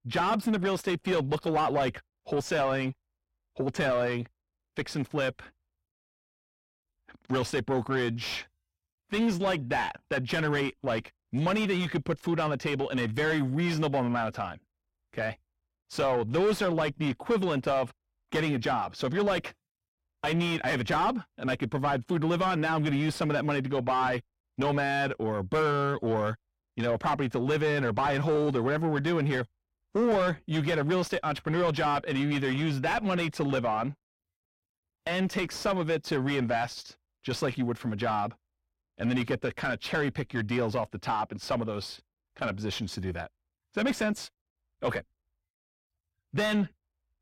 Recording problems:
distortion; heavy; 6 dB below the speech

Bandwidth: 16 kHz